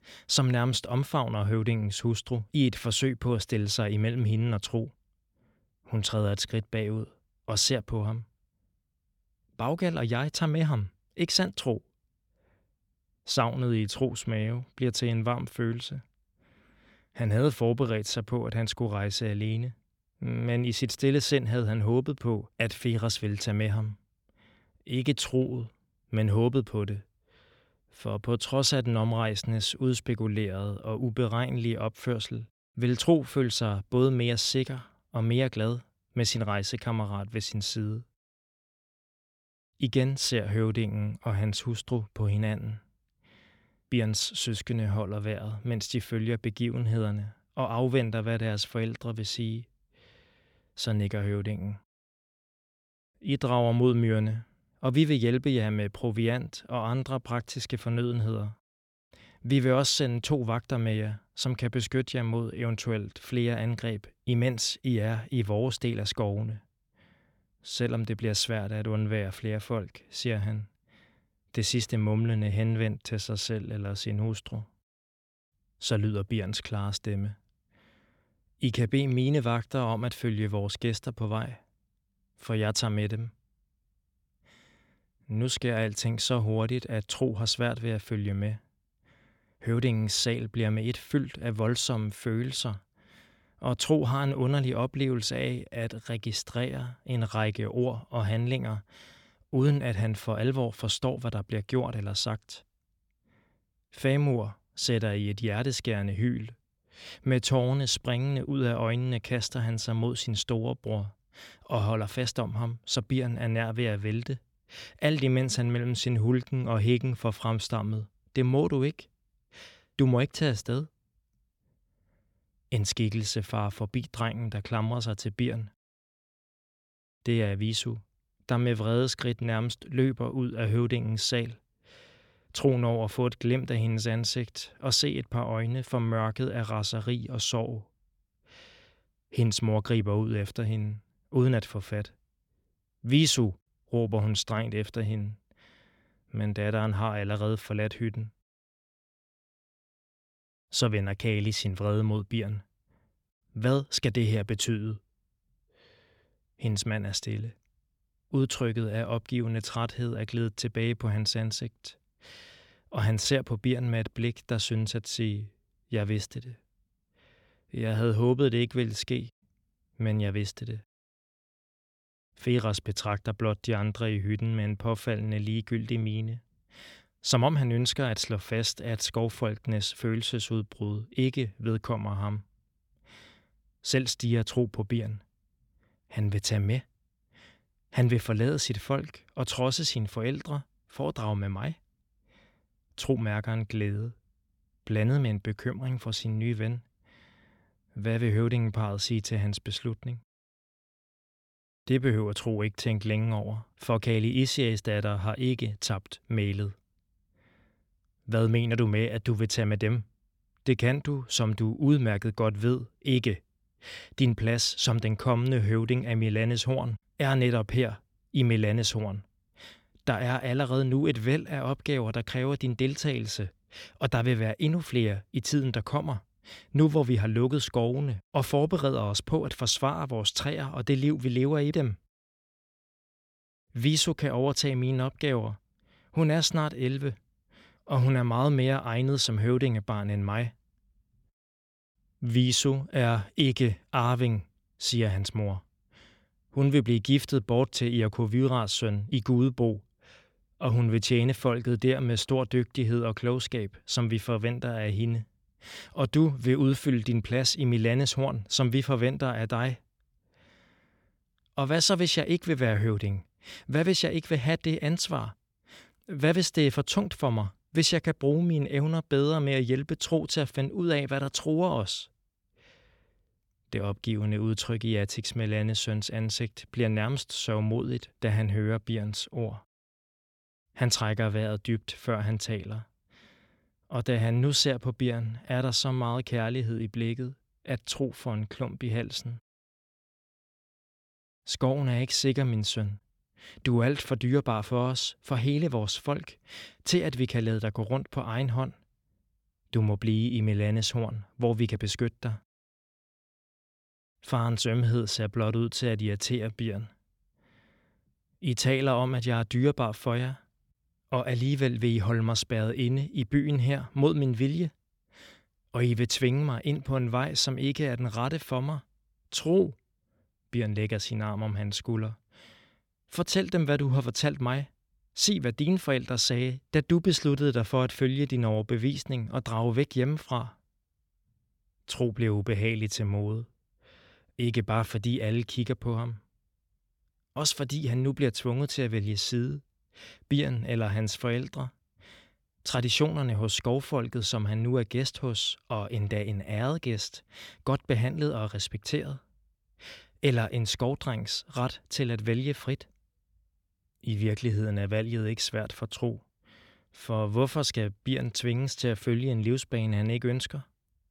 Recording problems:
none

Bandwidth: 17 kHz